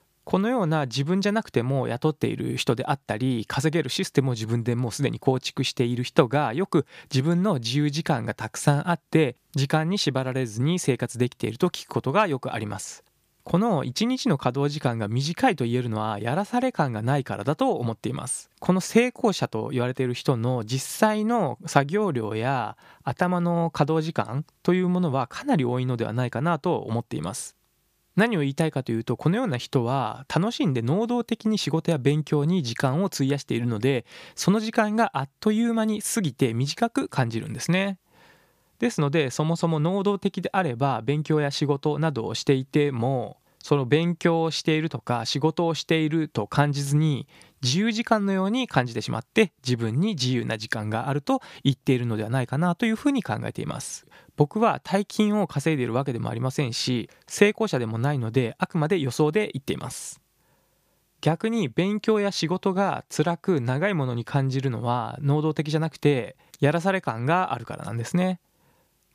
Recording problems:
none

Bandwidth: 15 kHz